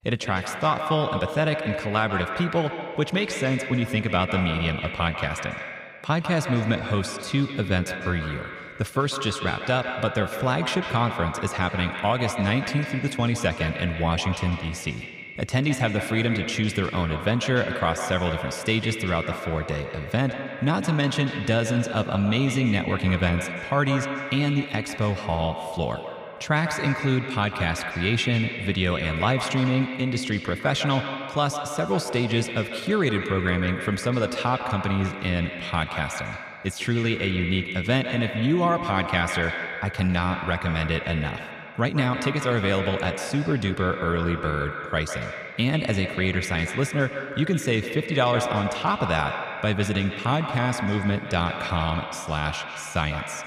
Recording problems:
echo of what is said; strong; throughout; 150 ms later, 6 dB below the speech

